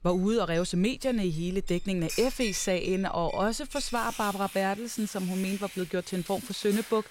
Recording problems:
household noises; noticeable; throughout; 10 dB below the speech

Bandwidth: 16 kHz